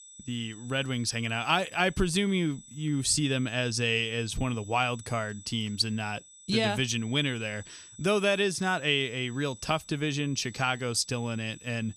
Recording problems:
high-pitched whine; noticeable; throughout; 8 kHz, 20 dB below the speech

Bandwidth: 14.5 kHz